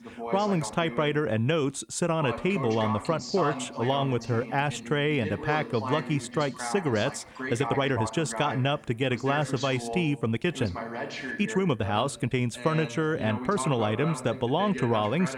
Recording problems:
voice in the background; loud; throughout; 9 dB below the speech
uneven, jittery; strongly; from 3 to 14 s

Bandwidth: 18 kHz